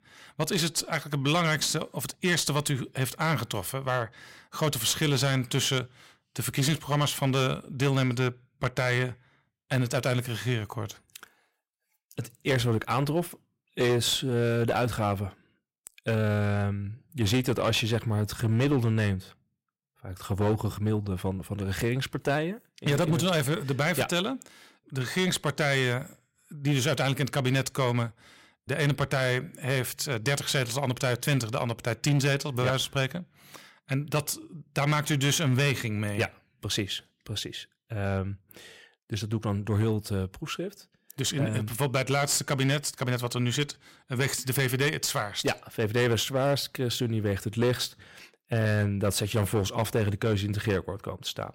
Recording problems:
distortion; slight; 8% of the sound clipped

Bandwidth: 16 kHz